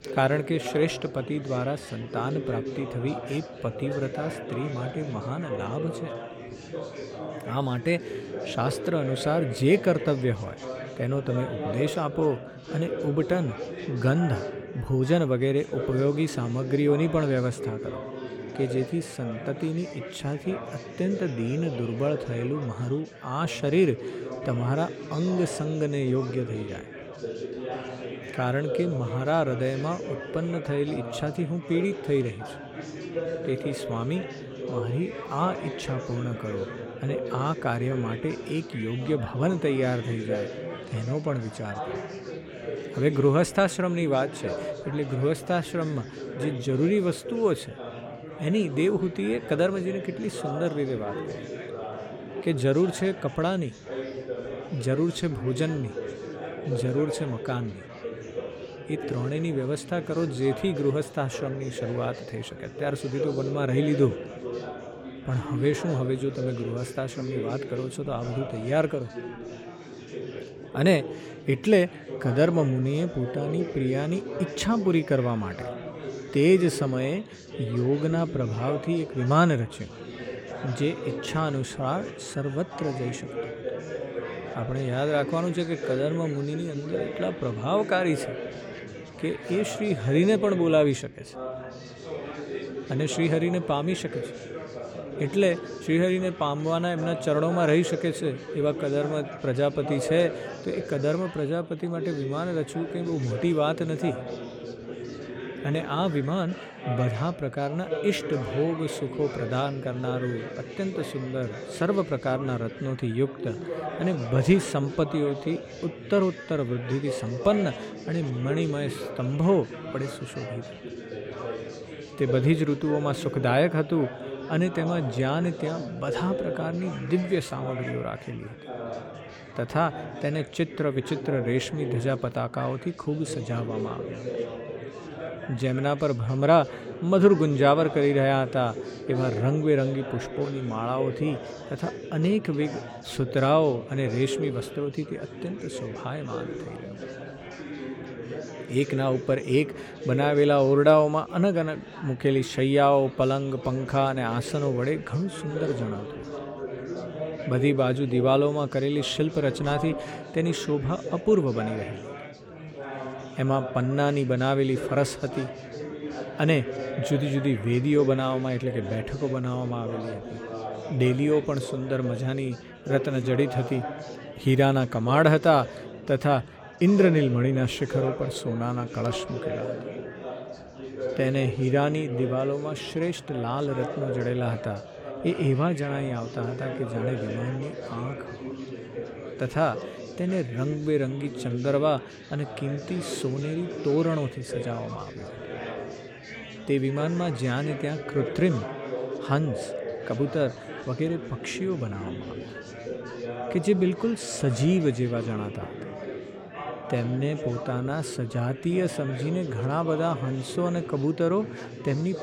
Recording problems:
chatter from many people; loud; throughout; 9 dB below the speech

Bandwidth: 17.5 kHz